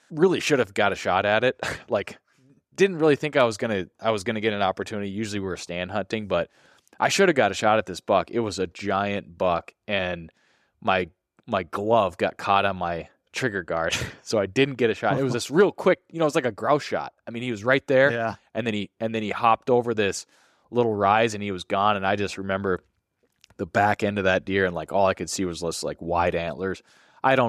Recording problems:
abrupt cut into speech; at the end

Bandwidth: 14.5 kHz